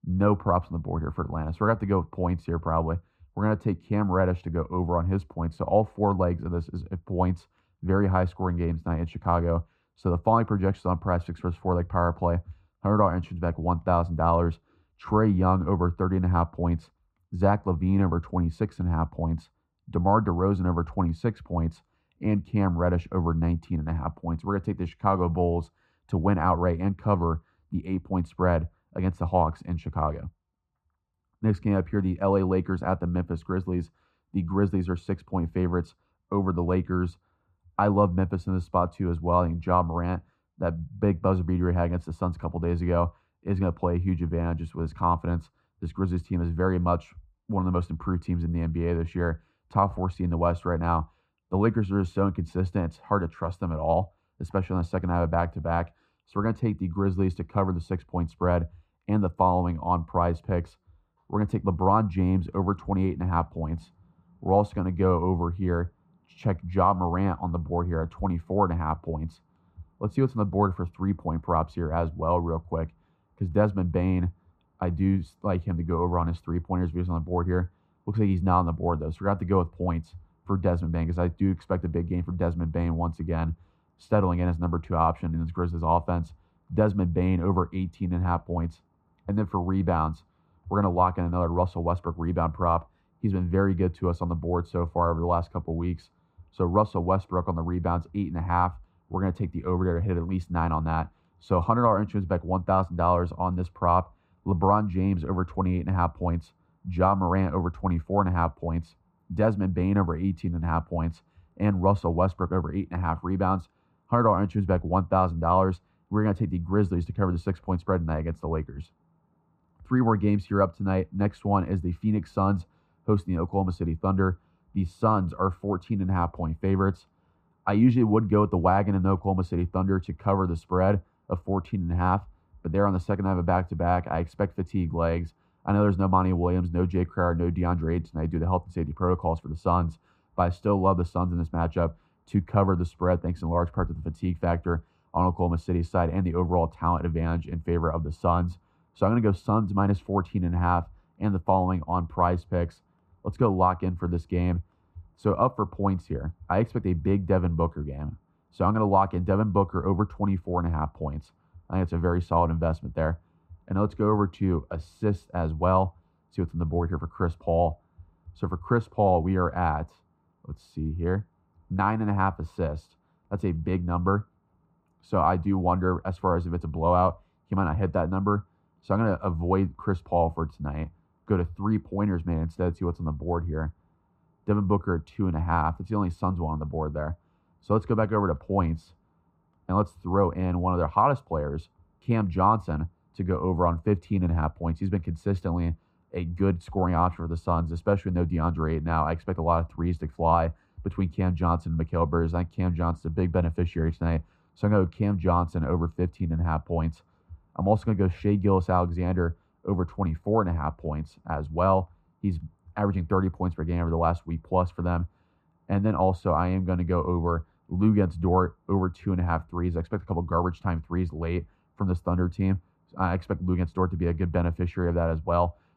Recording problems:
muffled; very; fading above 3 kHz

